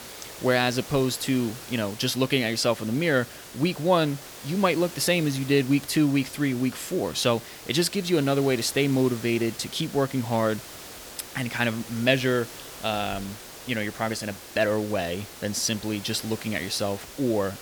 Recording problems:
hiss; noticeable; throughout; 15 dB below the speech

